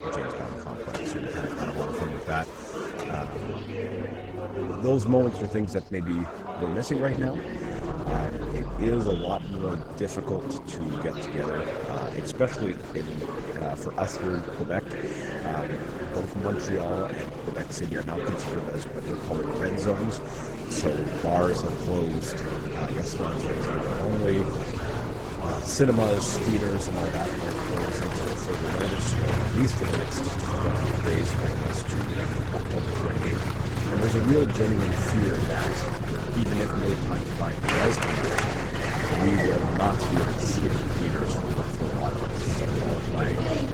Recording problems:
garbled, watery; slightly; nothing above 18.5 kHz
traffic noise; loud; throughout; 3 dB below the speech
chatter from many people; loud; throughout; 3 dB below the speech

